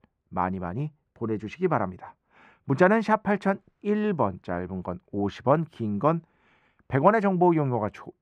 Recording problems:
muffled; very; fading above 3.5 kHz

